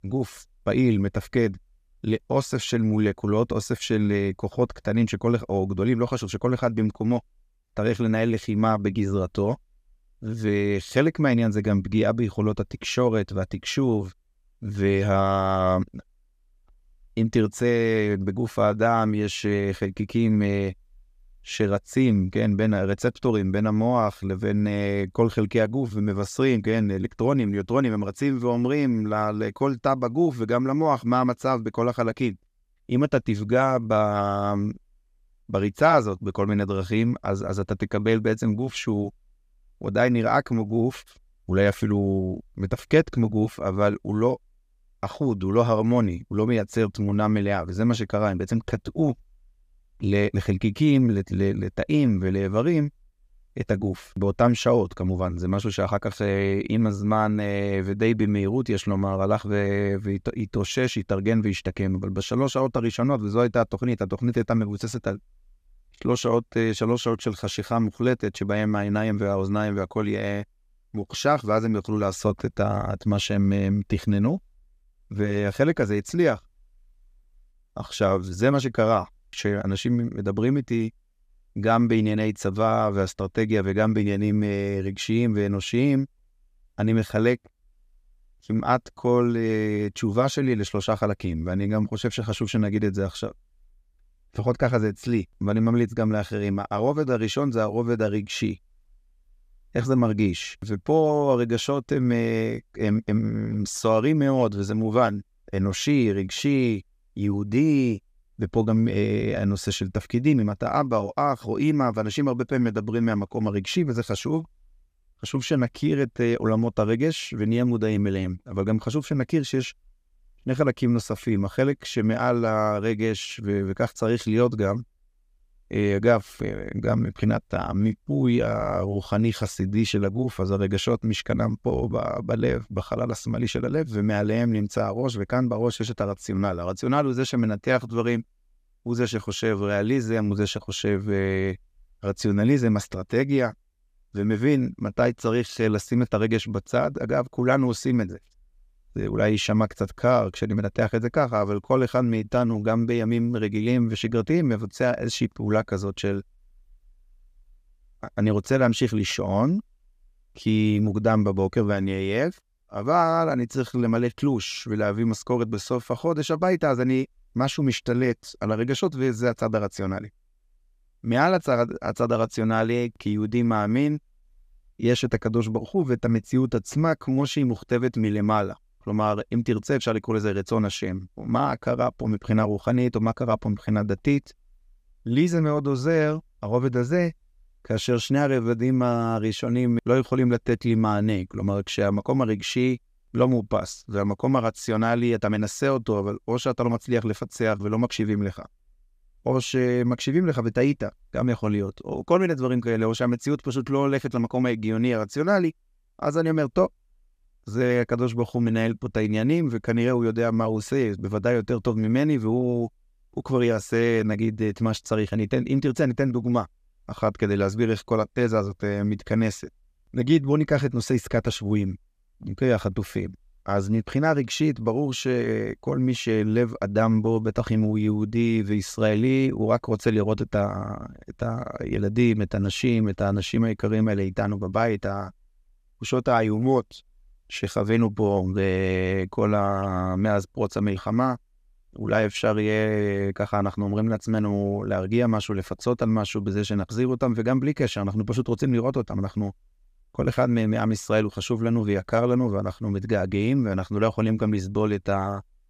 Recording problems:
none

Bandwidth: 15 kHz